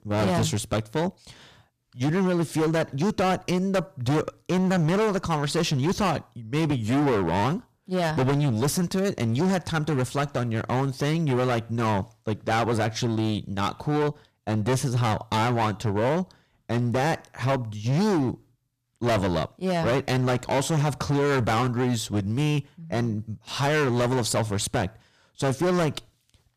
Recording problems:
distortion; heavy; 21% of the sound clipped

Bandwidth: 15 kHz